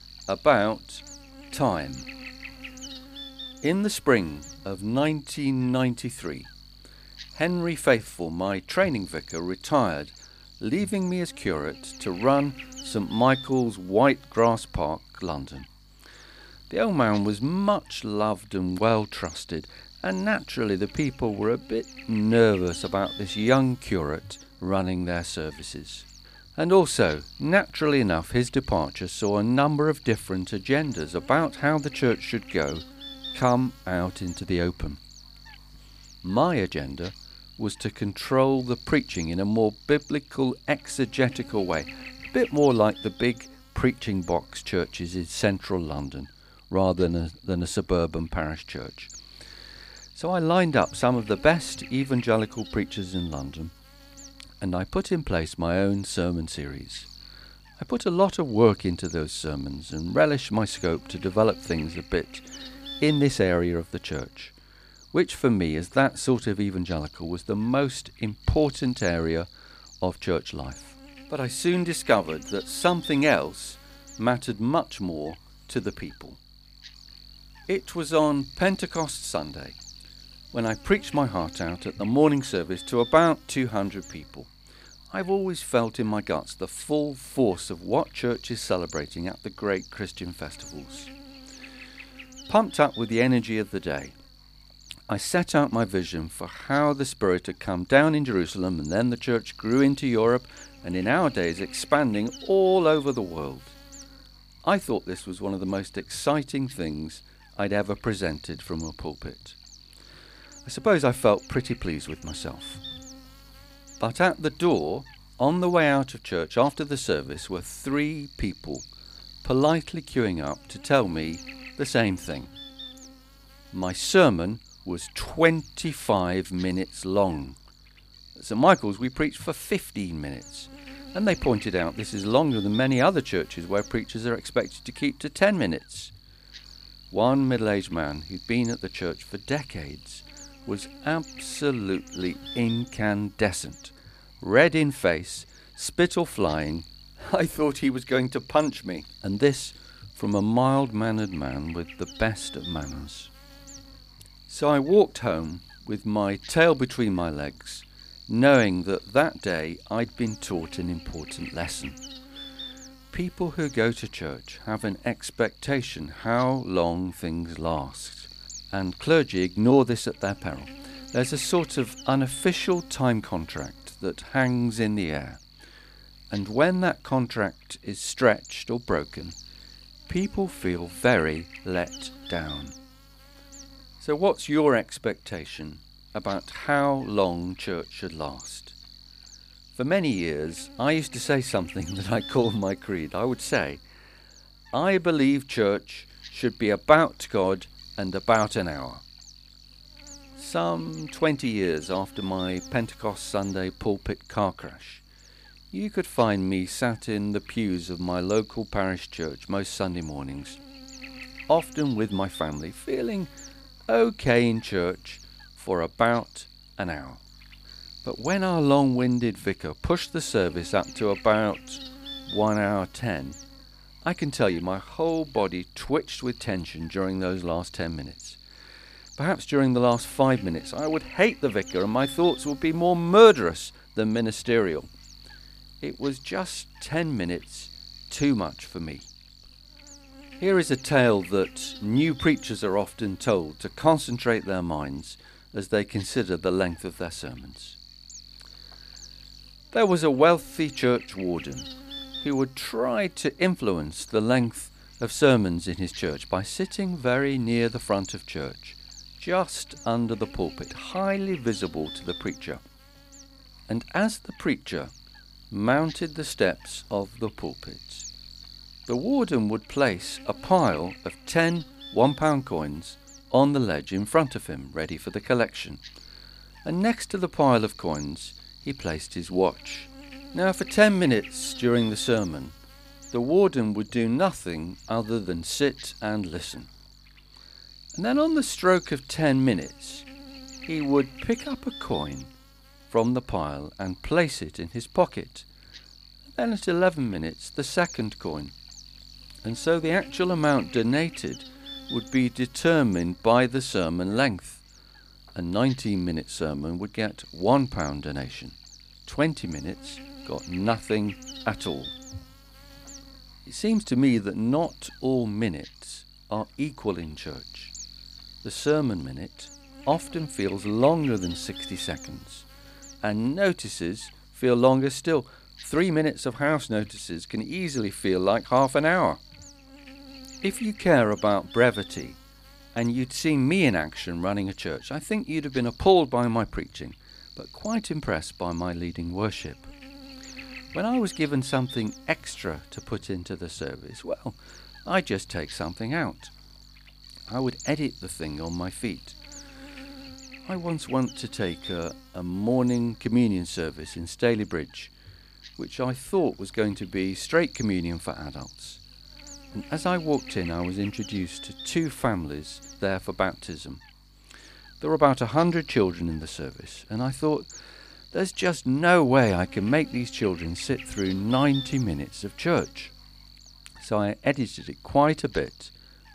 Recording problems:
electrical hum; noticeable; throughout; 50 Hz, 20 dB below the speech

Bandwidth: 15 kHz